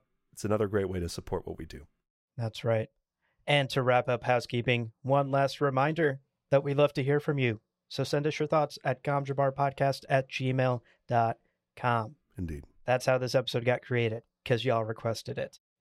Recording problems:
none

